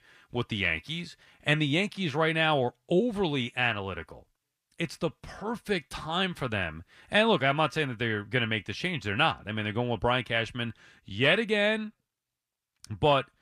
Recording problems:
none

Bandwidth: 15 kHz